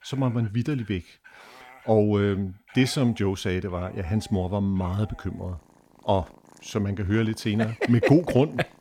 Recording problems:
animal sounds; faint; throughout; 25 dB below the speech

